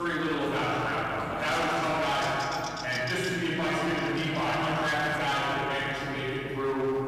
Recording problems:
room echo; strong; dies away in 2.6 s
off-mic speech; far
distortion; slight; 18% of the sound clipped
electrical hum; noticeable; throughout; 50 Hz, 15 dB below the speech
voice in the background; faint; throughout; 25 dB below the speech
abrupt cut into speech; at the start

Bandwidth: 14.5 kHz